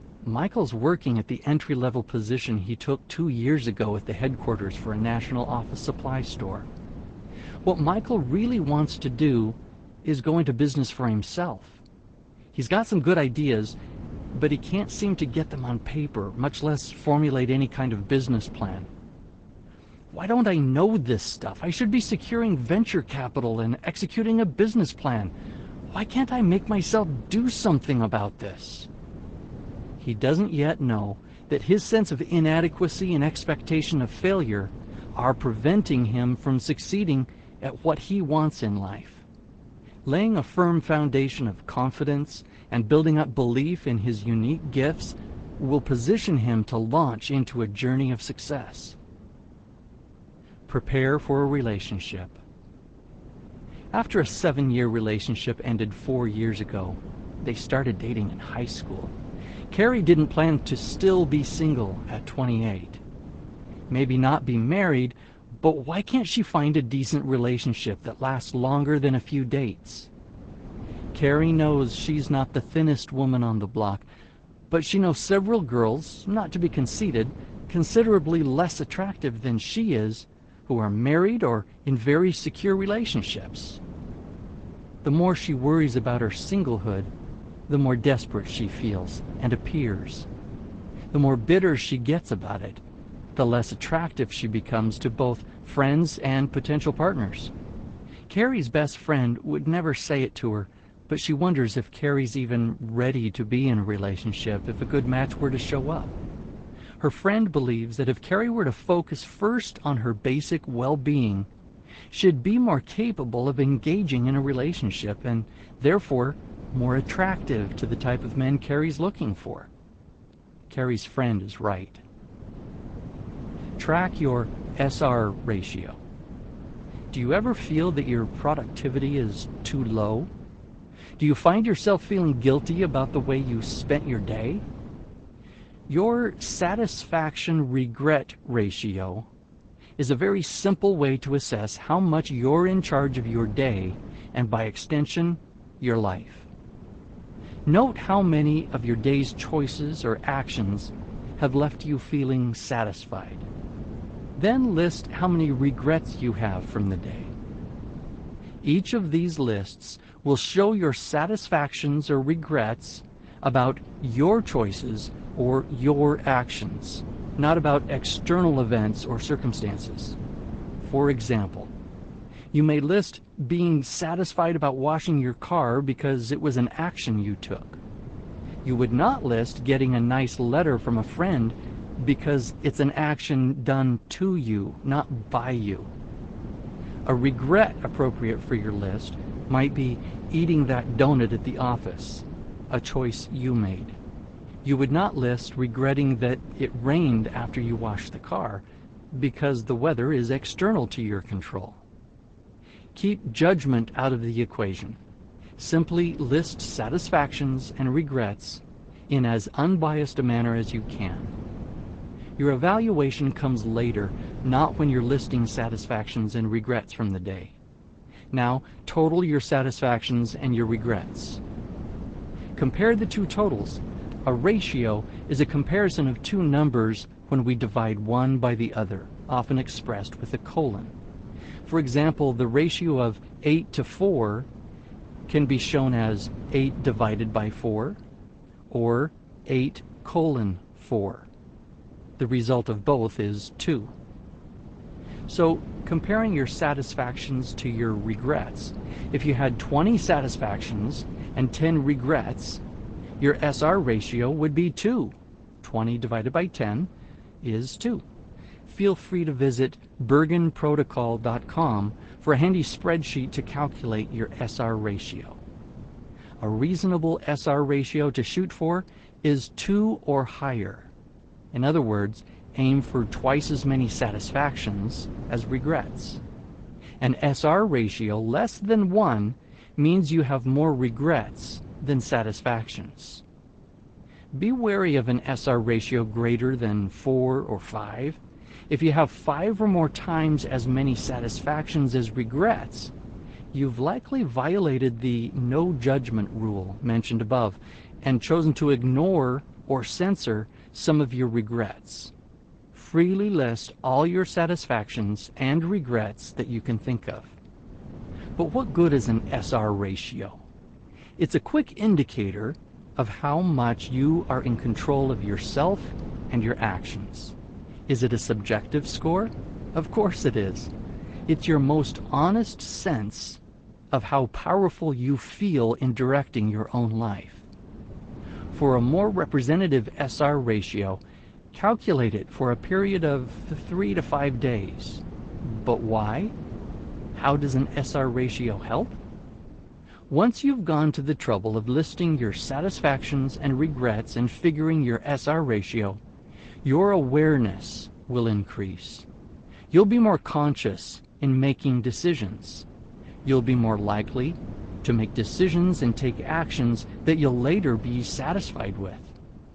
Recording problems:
garbled, watery; slightly; nothing above 8 kHz
wind noise on the microphone; occasional gusts; 20 dB below the speech

